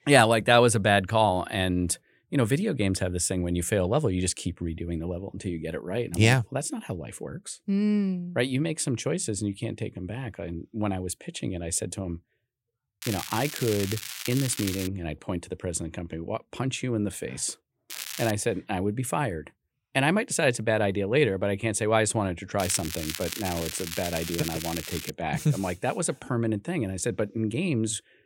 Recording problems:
crackling; loud; from 13 to 15 s, at 18 s and from 23 to 25 s; 7 dB below the speech

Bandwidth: 16.5 kHz